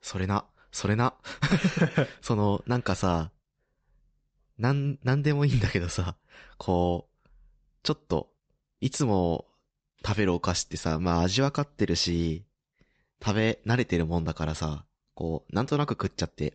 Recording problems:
high frequencies cut off; noticeable; nothing above 8 kHz

